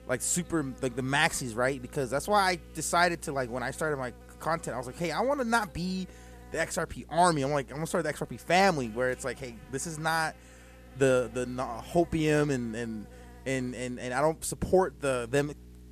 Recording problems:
electrical hum; faint; throughout; 60 Hz, 25 dB below the speech

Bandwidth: 14.5 kHz